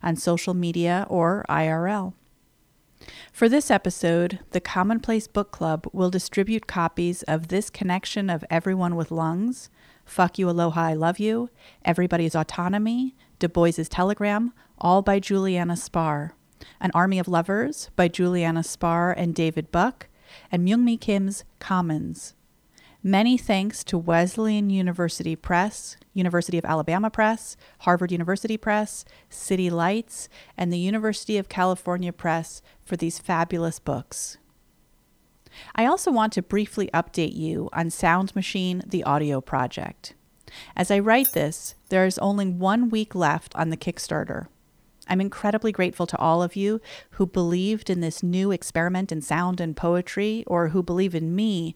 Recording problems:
uneven, jittery; strongly; from 4 to 49 s
jangling keys; noticeable; at 41 s; peak 1 dB below the speech

